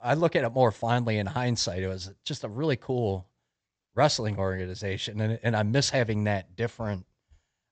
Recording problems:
high frequencies cut off; noticeable; nothing above 8 kHz

